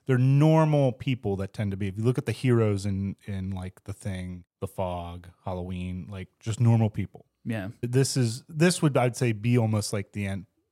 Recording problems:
none

